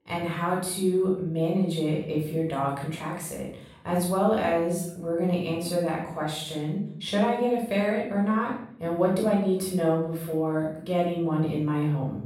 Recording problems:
off-mic speech; far
room echo; noticeable; dies away in 0.6 s

